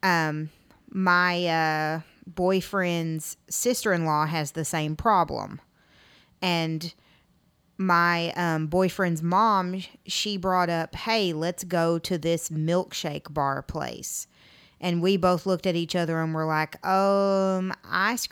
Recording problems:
none

